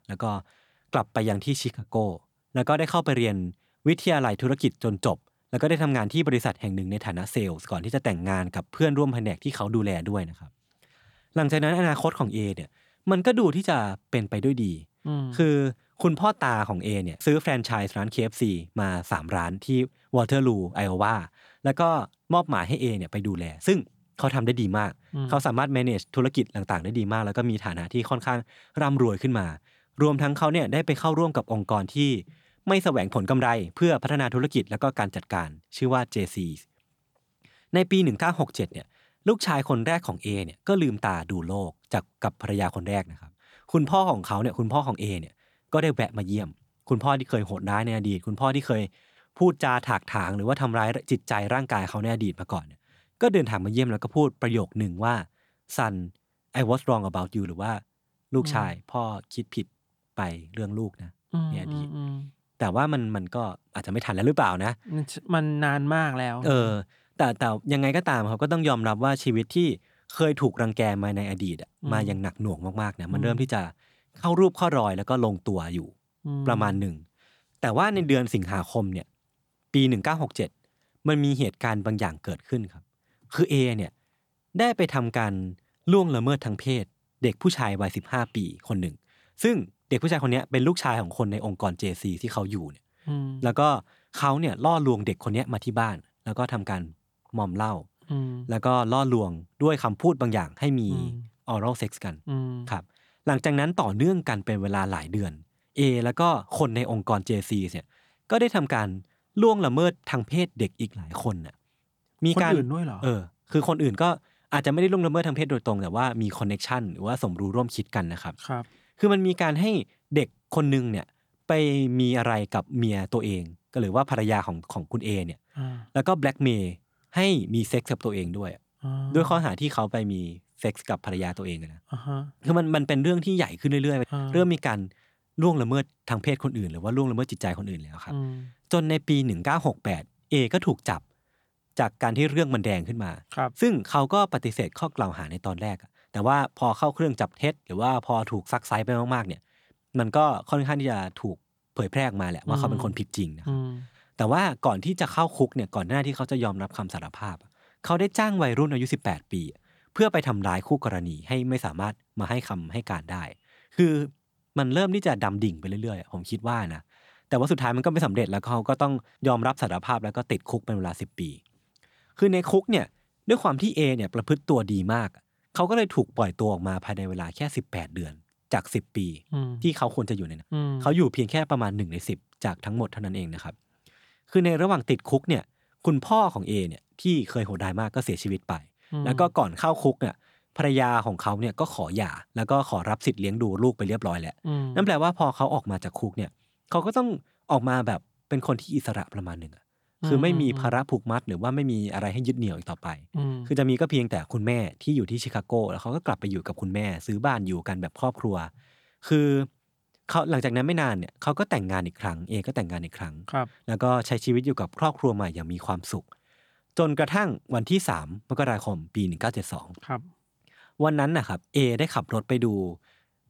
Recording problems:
none

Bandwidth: 18.5 kHz